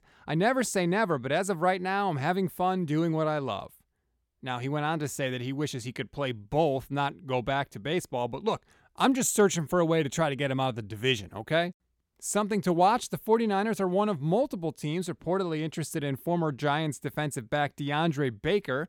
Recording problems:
none

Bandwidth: 17.5 kHz